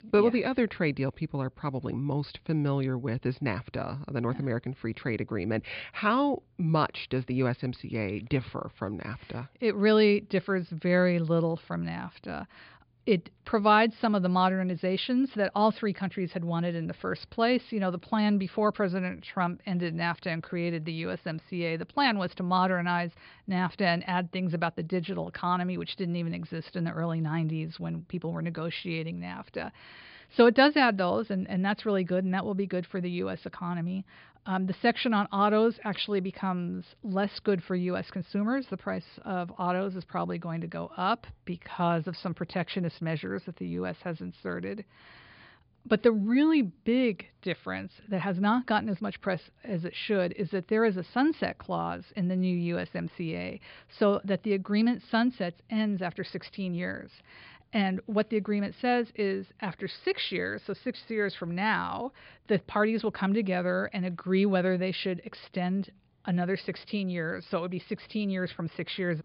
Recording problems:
high frequencies cut off; severe; nothing above 5 kHz

